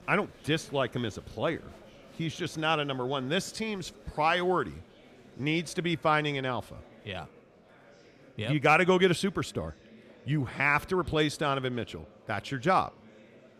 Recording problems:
murmuring crowd; faint; throughout; 25 dB below the speech

